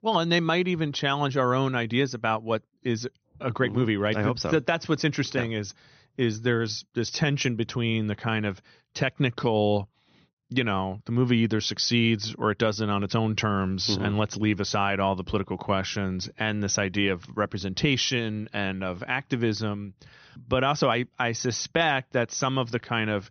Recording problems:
high frequencies cut off; noticeable; nothing above 6 kHz

